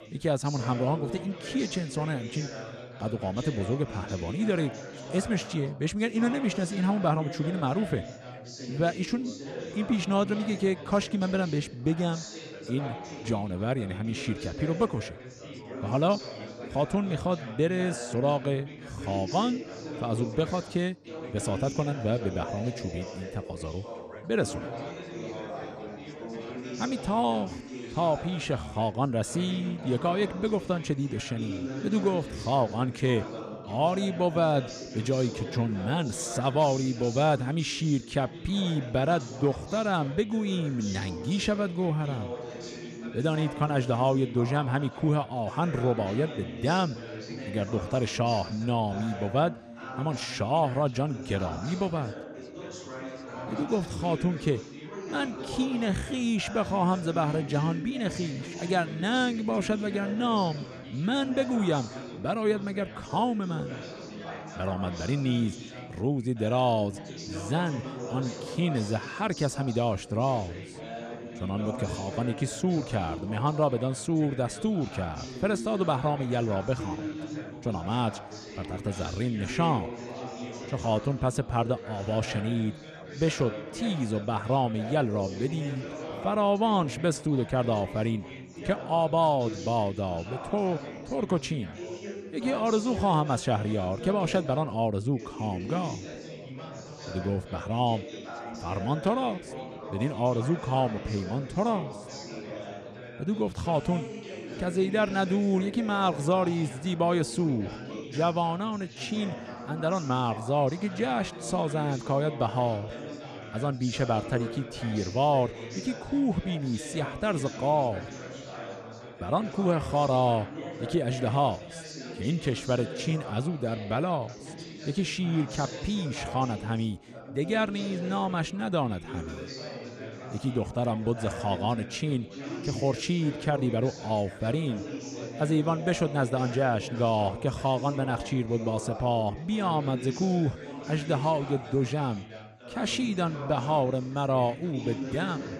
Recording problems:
background chatter; noticeable; throughout; 3 voices, 10 dB below the speech

